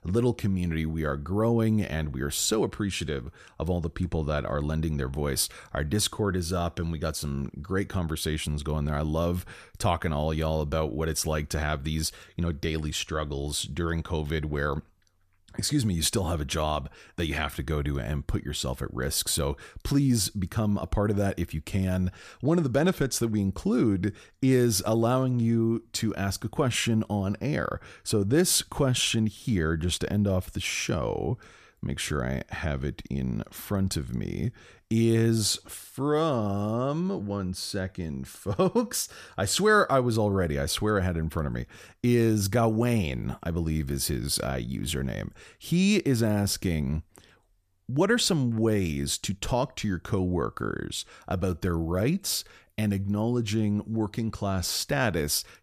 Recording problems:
none

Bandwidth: 14.5 kHz